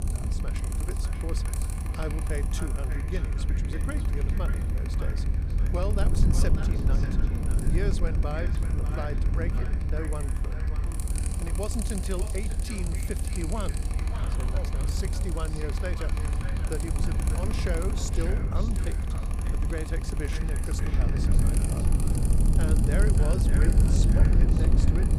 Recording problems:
echo of what is said; strong; throughout; 590 ms later, 10 dB below the speech
machinery noise; loud; throughout; 4 dB below the speech
low rumble; loud; throughout; 3 dB below the speech
background music; very faint; throughout; 25 dB below the speech

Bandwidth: 14.5 kHz